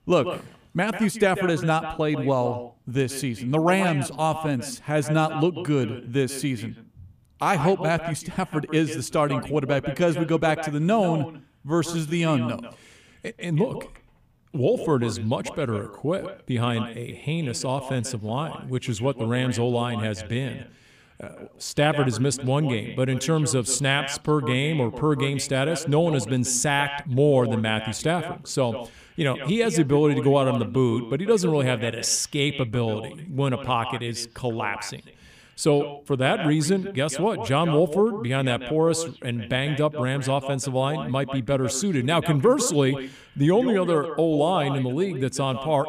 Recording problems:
echo of what is said; strong; throughout; 140 ms later, 10 dB below the speech

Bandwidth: 15 kHz